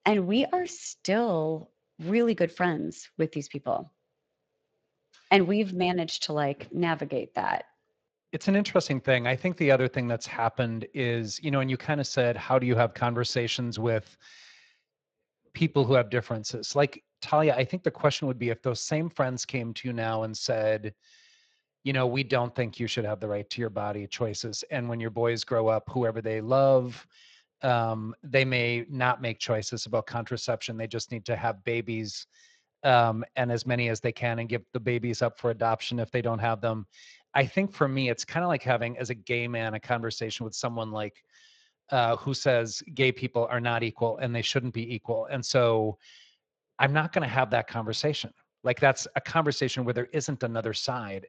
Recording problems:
garbled, watery; slightly

